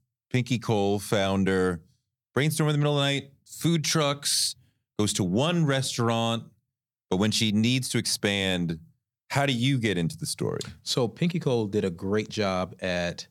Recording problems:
none

